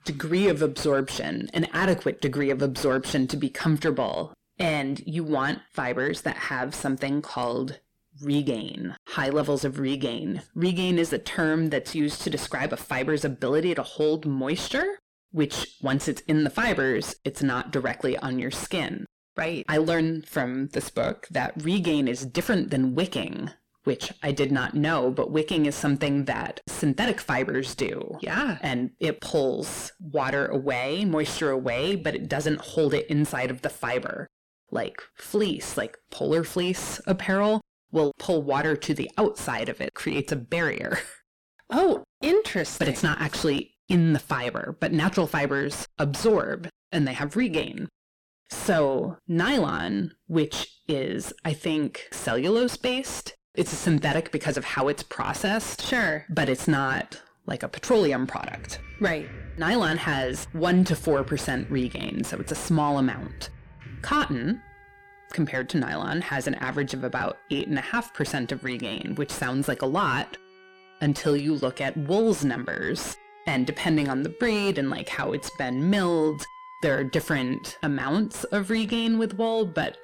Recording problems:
distortion; heavy; 6 dB below the speech
background music; faint; from 58 s on; 20 dB below the speech

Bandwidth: 17 kHz